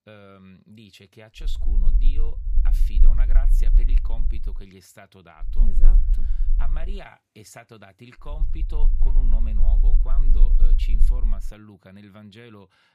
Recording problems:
low rumble; loud; from 1.5 to 4.5 s, from 5.5 to 7 s and from 8.5 to 11 s; 5 dB below the speech

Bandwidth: 15 kHz